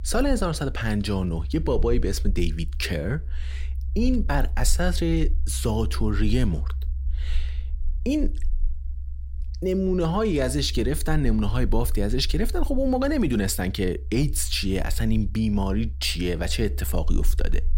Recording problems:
low rumble; faint; throughout; 25 dB below the speech

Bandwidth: 16 kHz